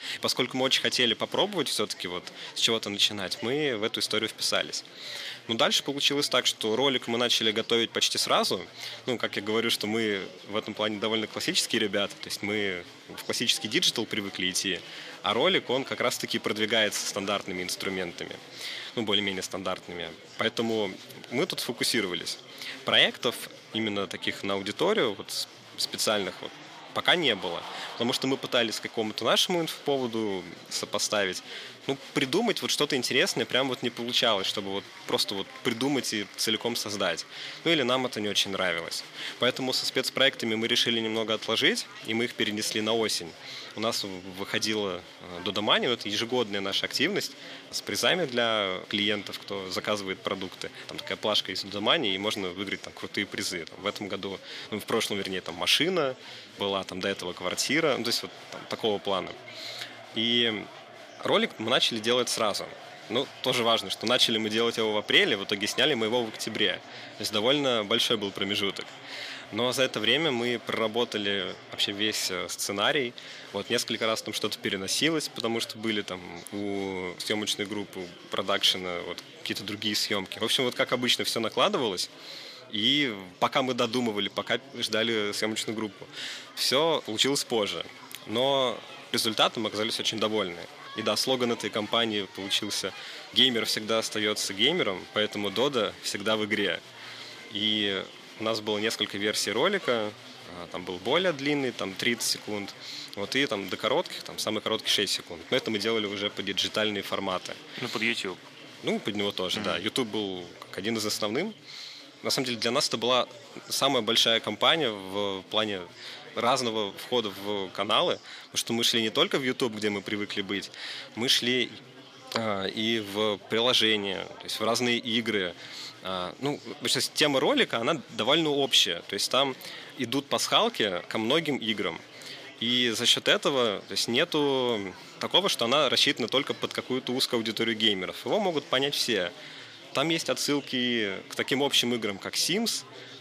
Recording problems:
thin; very slightly; fading below 600 Hz
chatter from many people; noticeable; throughout; 20 dB below the speech

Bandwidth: 14.5 kHz